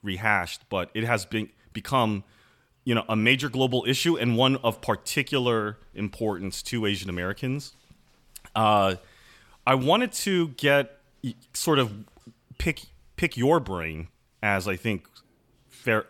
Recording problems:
none

